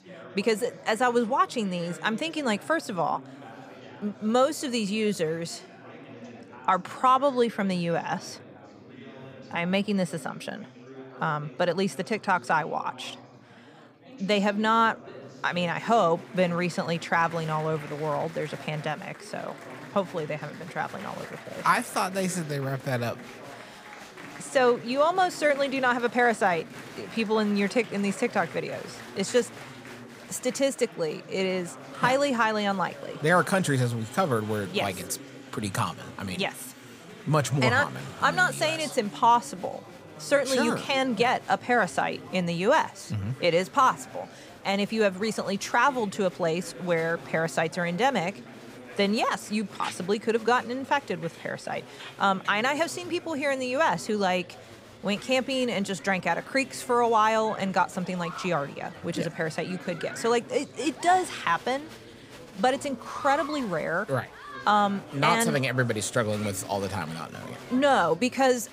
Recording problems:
chatter from many people; noticeable; throughout; 15 dB below the speech

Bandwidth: 15.5 kHz